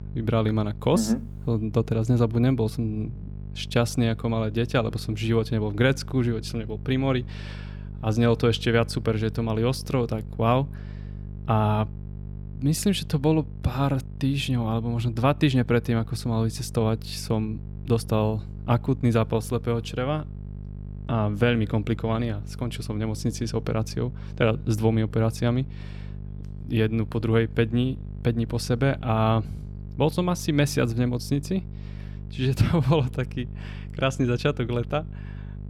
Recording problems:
electrical hum; faint; throughout; 50 Hz, 20 dB below the speech

